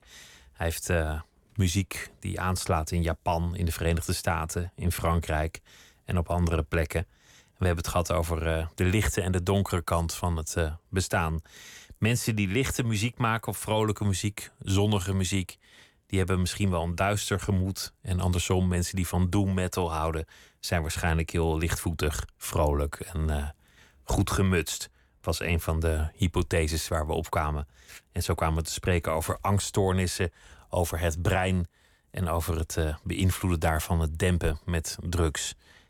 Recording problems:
none

